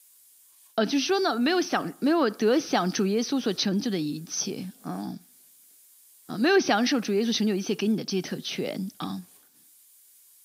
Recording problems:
high frequencies cut off; noticeable; nothing above 6 kHz
hiss; faint; throughout; 25 dB below the speech

